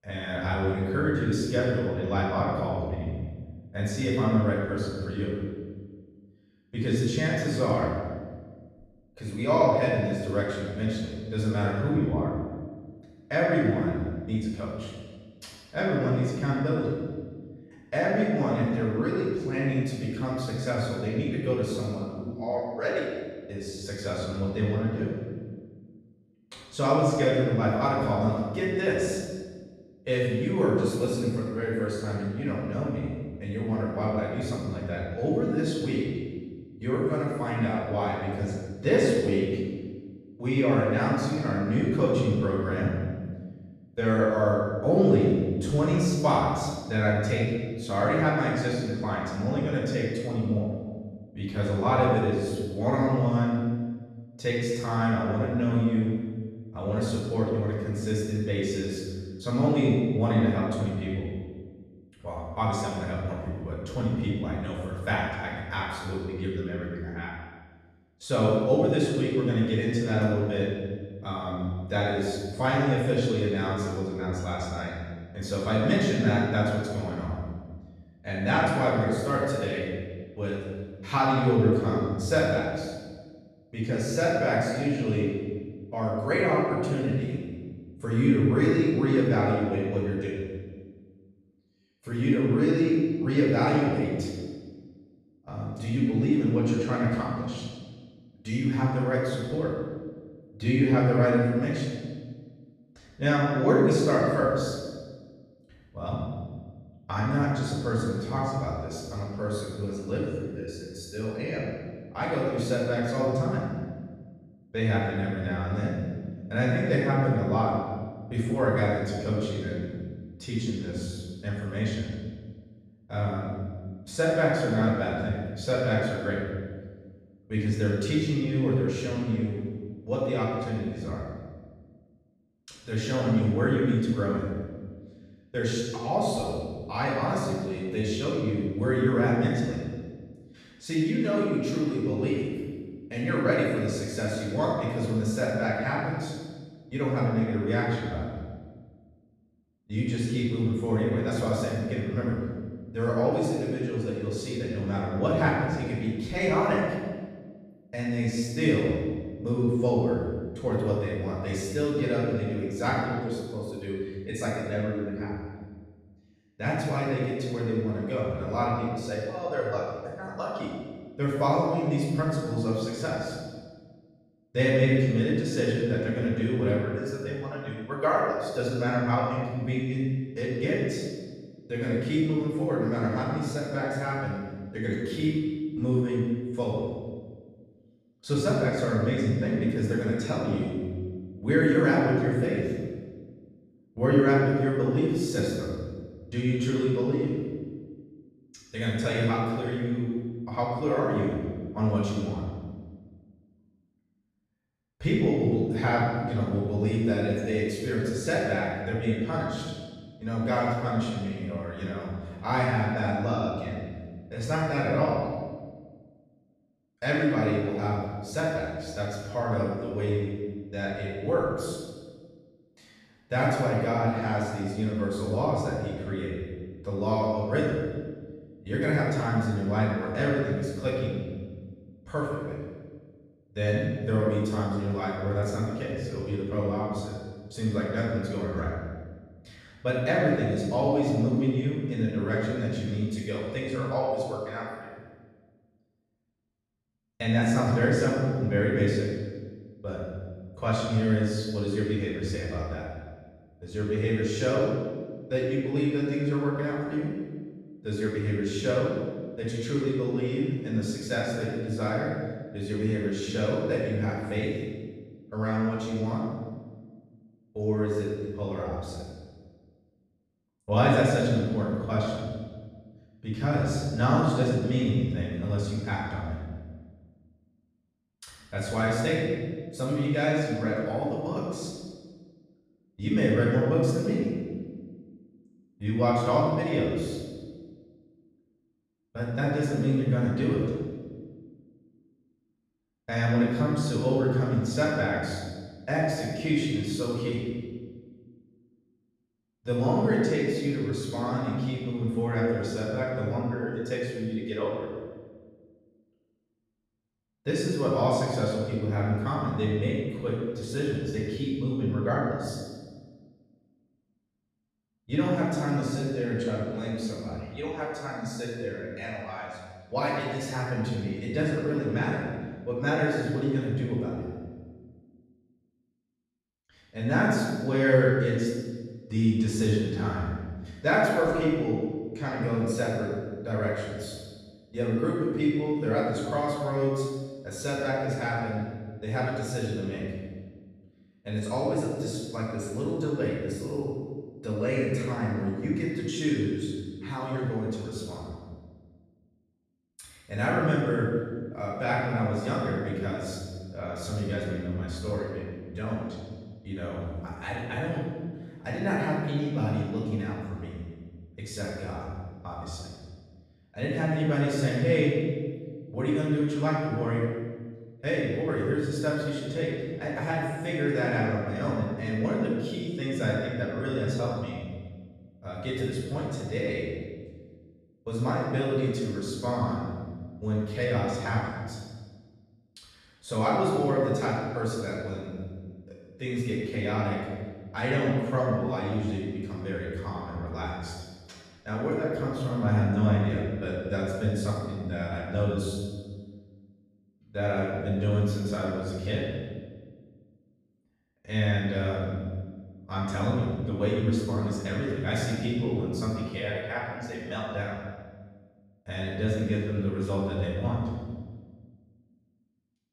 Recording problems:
room echo; strong; dies away in 1.4 s
off-mic speech; far

